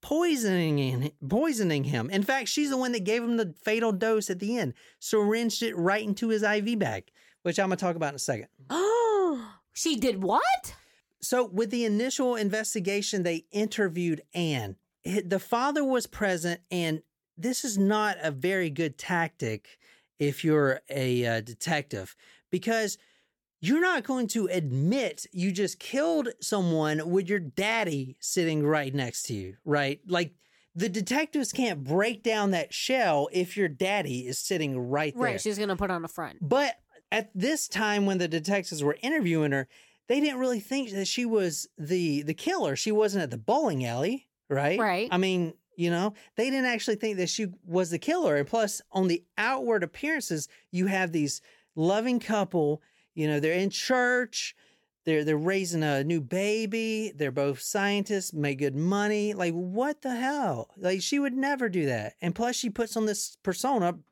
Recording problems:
none

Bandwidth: 17 kHz